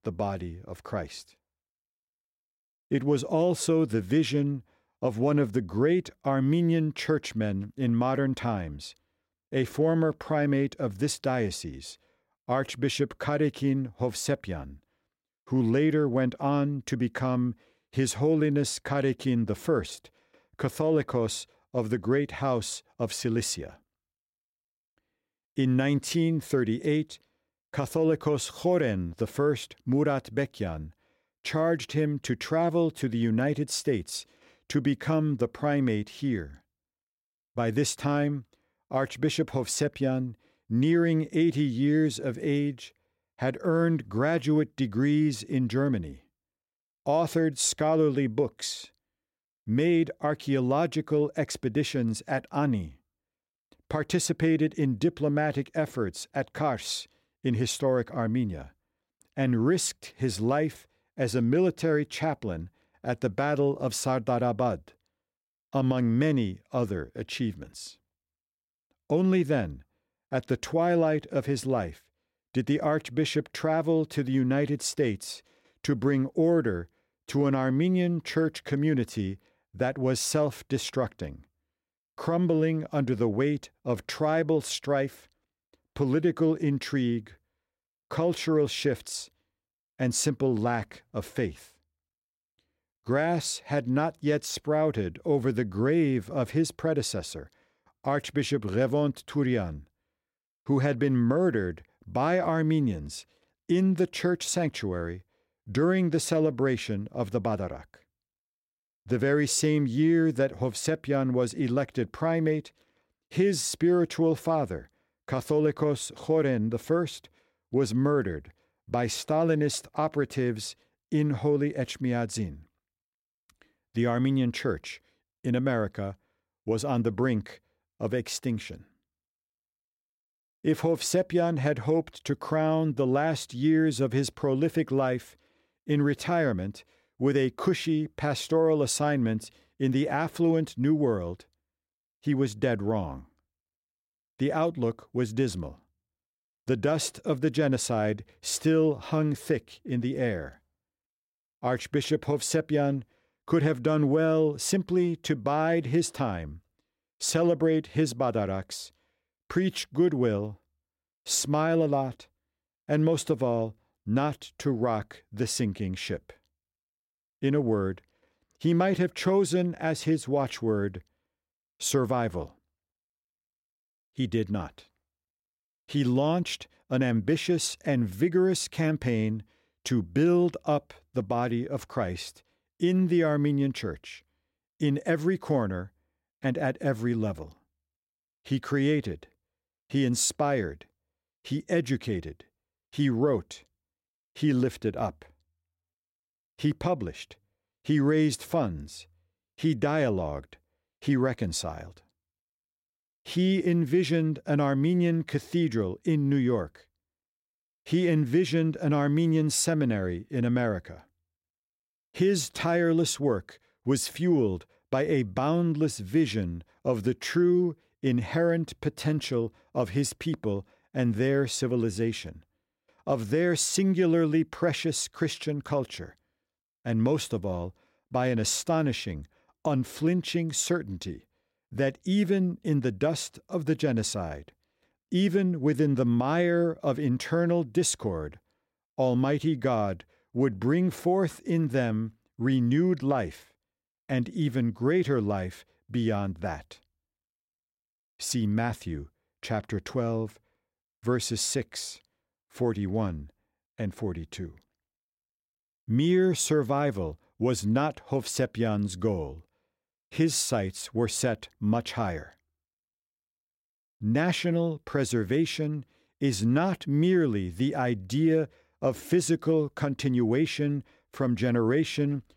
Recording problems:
none

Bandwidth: 16 kHz